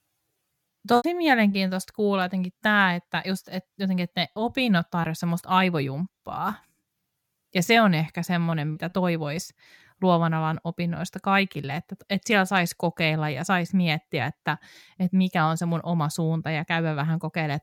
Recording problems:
choppy; occasionally; at 1 s and at 8.5 s; 4% of the speech affected

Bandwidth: 17.5 kHz